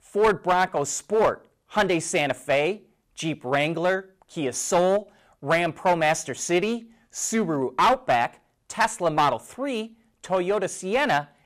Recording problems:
distortion; slight; 5% of the sound clipped

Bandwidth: 15 kHz